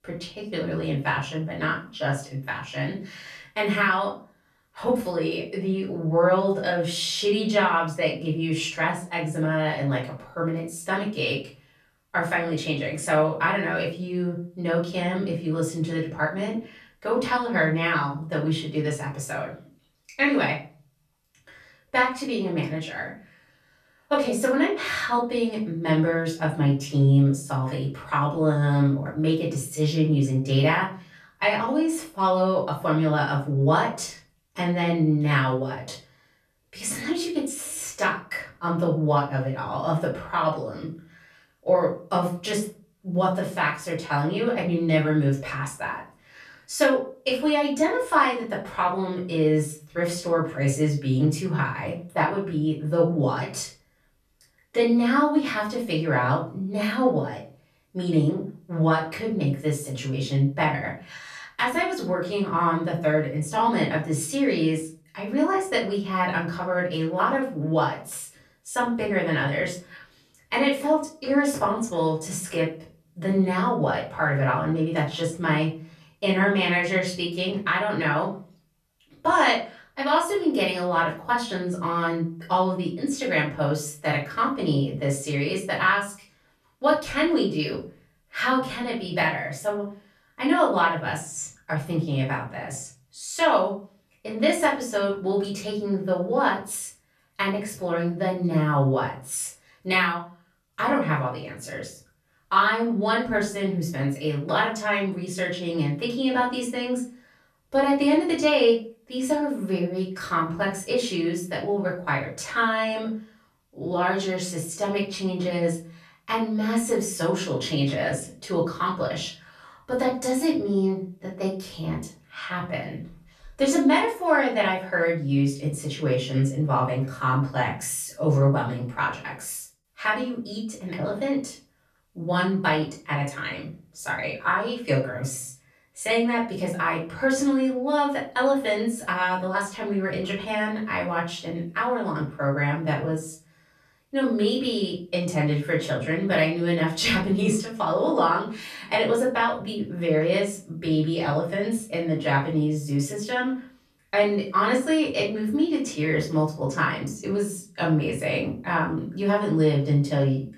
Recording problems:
off-mic speech; far
room echo; slight; dies away in 0.3 s

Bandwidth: 14 kHz